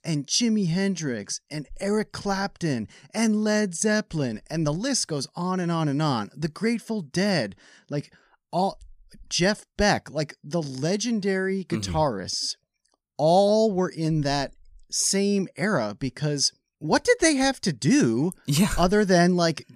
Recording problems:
none

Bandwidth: 15 kHz